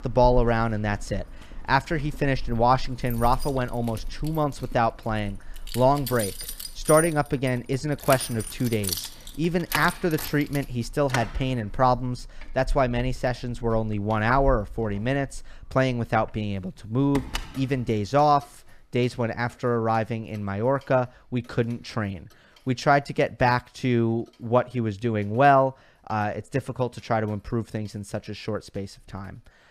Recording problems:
household noises; noticeable; throughout; 10 dB below the speech

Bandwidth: 14.5 kHz